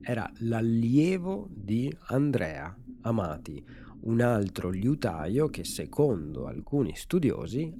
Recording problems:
low rumble; faint; throughout; 20 dB below the speech

